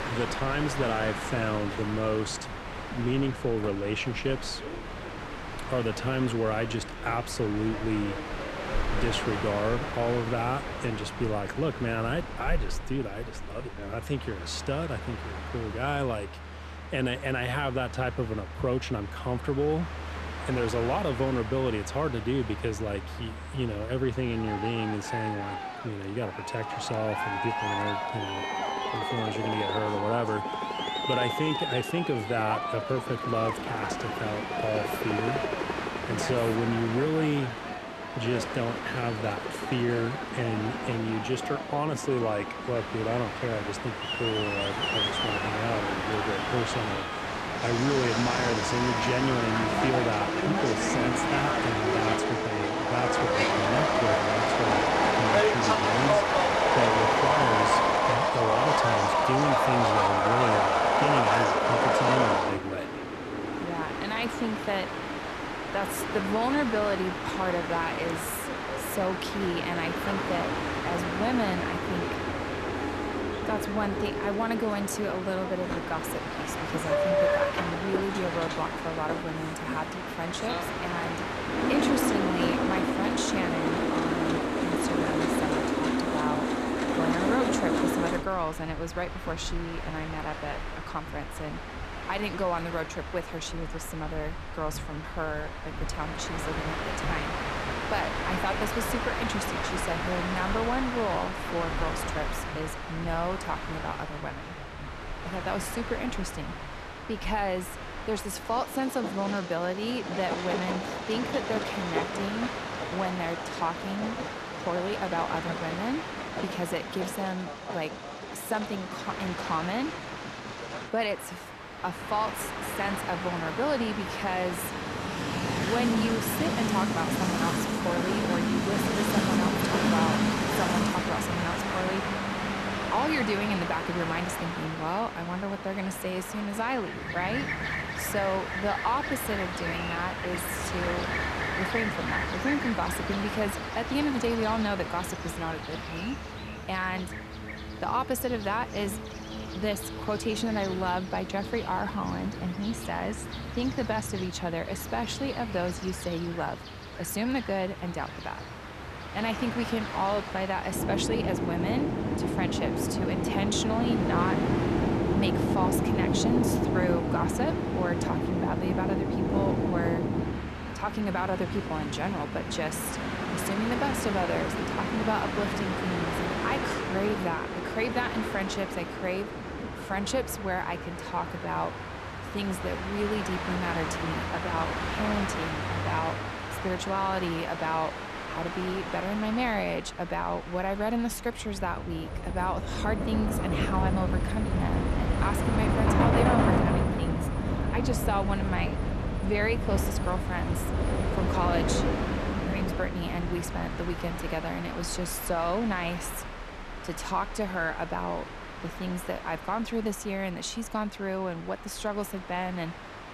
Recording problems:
train or aircraft noise; very loud; throughout; 1 dB above the speech

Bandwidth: 13.5 kHz